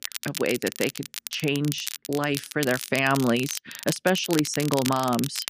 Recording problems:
crackle, like an old record; loud; 8 dB below the speech

